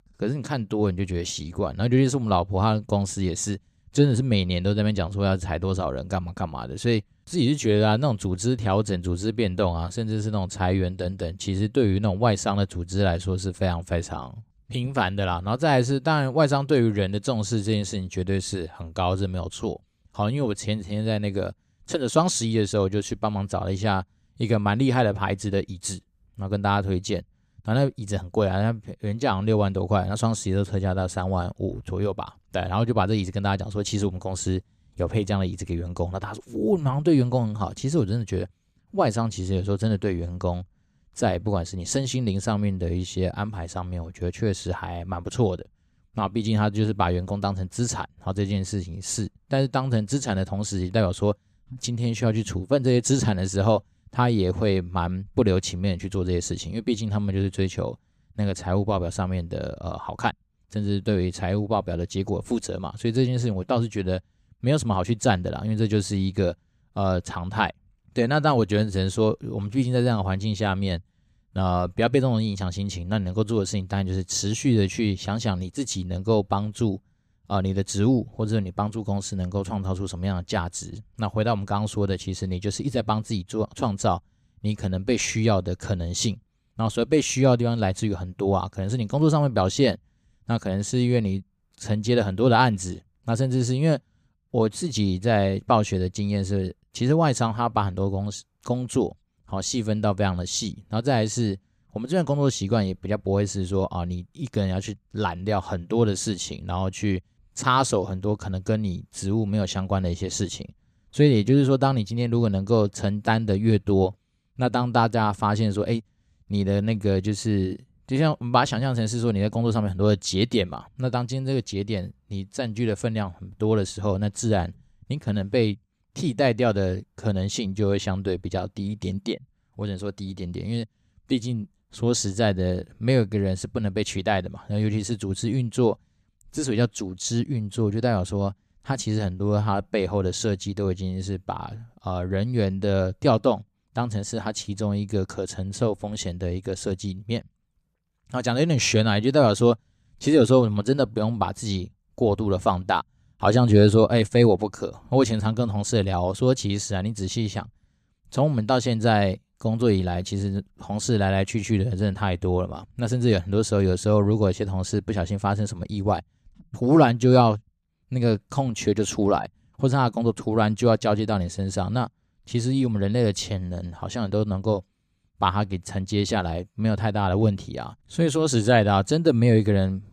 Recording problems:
none

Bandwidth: 14.5 kHz